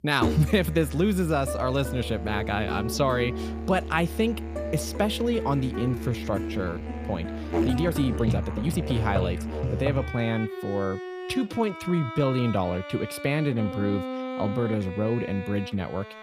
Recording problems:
background music; loud; throughout; 5 dB below the speech
uneven, jittery; strongly; from 6 to 15 s

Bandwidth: 15 kHz